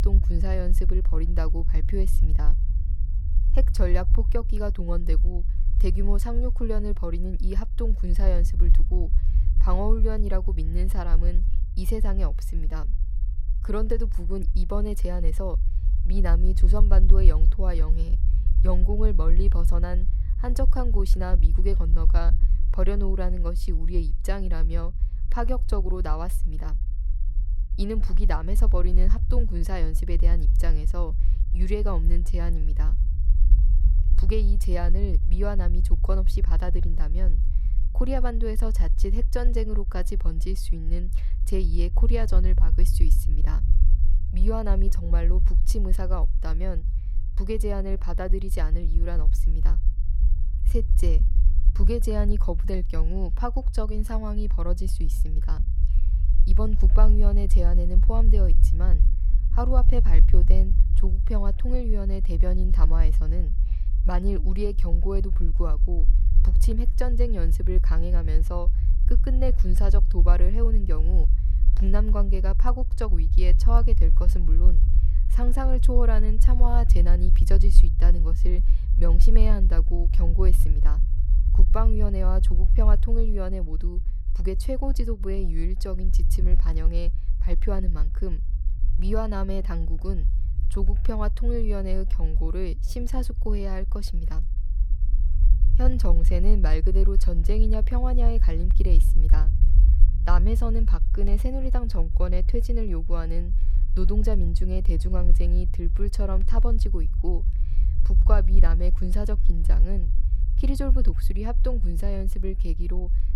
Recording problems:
low rumble; noticeable; throughout; 10 dB below the speech

